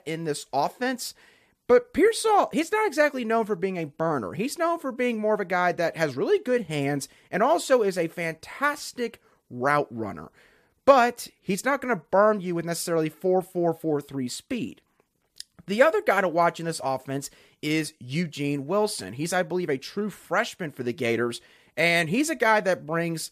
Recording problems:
none

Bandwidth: 14.5 kHz